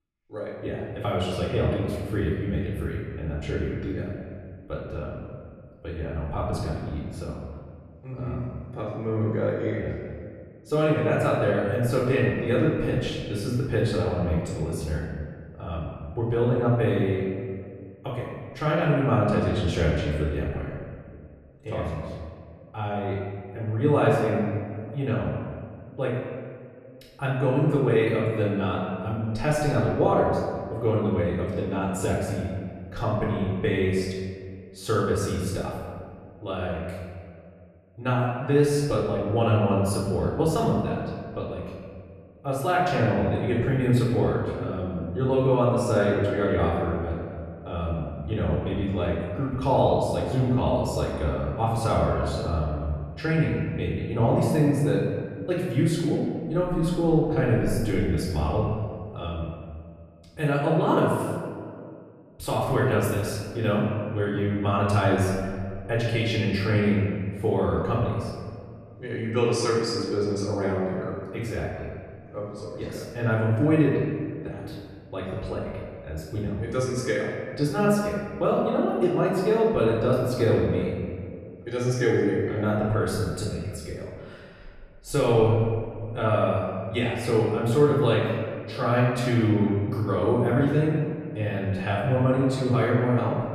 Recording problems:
off-mic speech; far
room echo; noticeable; dies away in 1.8 s

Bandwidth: 13.5 kHz